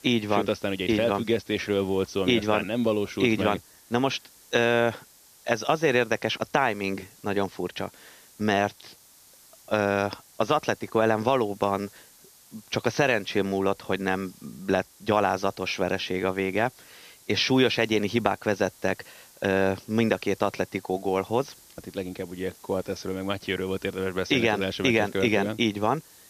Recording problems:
high frequencies cut off; noticeable; nothing above 6.5 kHz
hiss; faint; throughout; 25 dB below the speech

